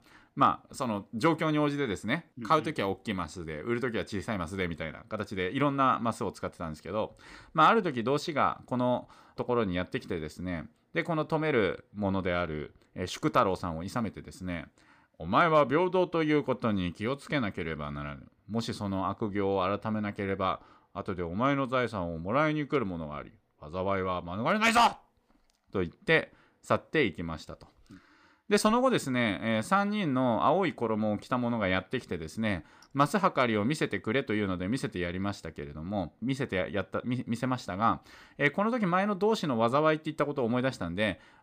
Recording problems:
none

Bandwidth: 15 kHz